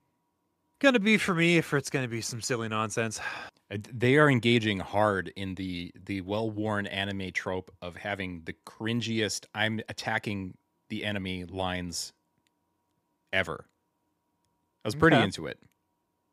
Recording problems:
none

